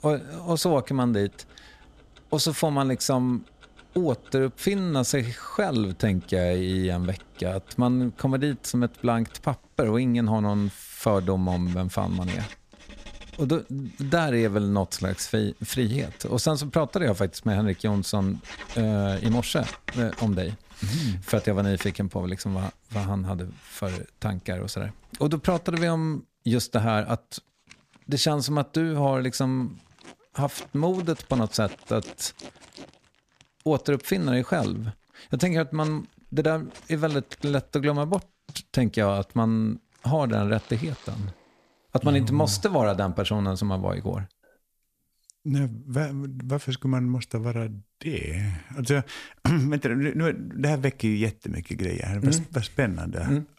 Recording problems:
household noises; noticeable; until 41 s; 20 dB below the speech

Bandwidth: 14.5 kHz